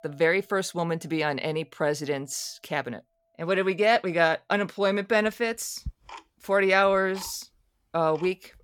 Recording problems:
household noises; faint; throughout; 20 dB below the speech

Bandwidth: 17.5 kHz